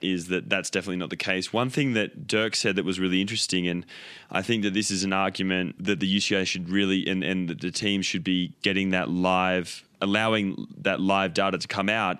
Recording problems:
none

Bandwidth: 14 kHz